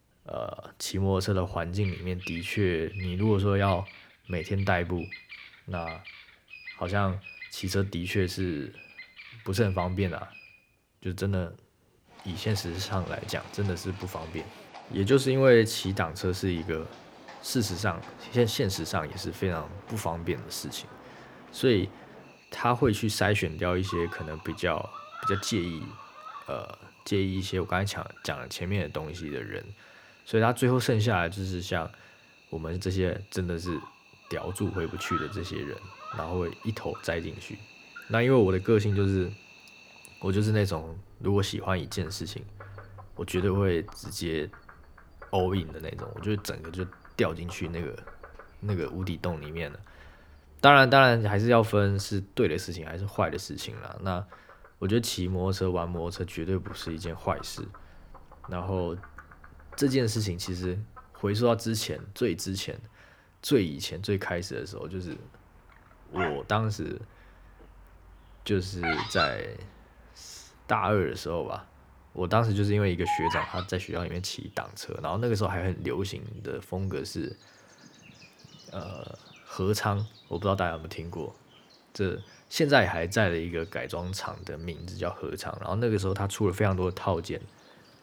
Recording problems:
animal sounds; noticeable; throughout; 15 dB below the speech

